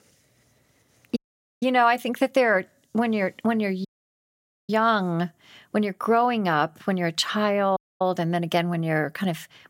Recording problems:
audio cutting out; at 1 s, at 4 s for 1 s and at 8 s

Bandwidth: 16 kHz